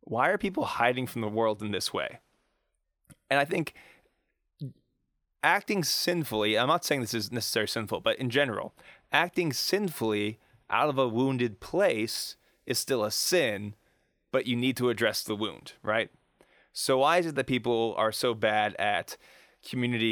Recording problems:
abrupt cut into speech; at the end

